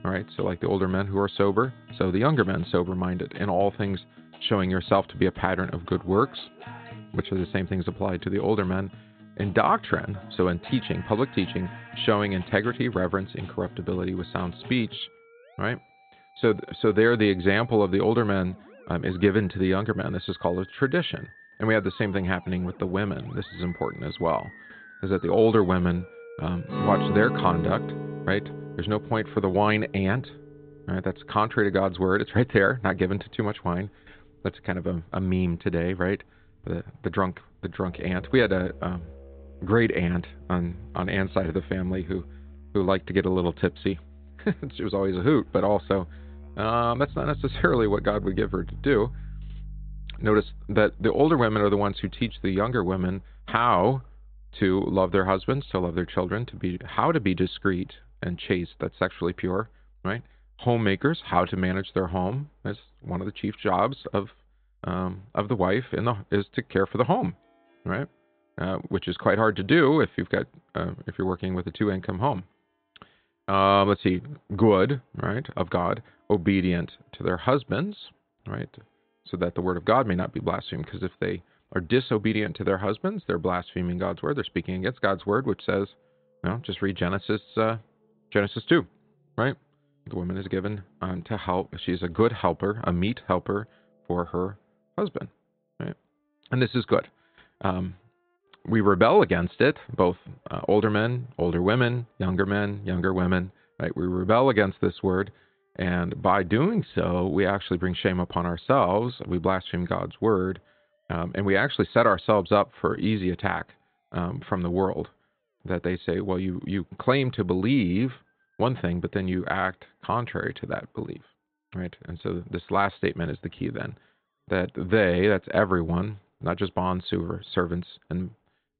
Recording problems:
high frequencies cut off; severe; nothing above 4 kHz
background music; noticeable; throughout; 15 dB below the speech

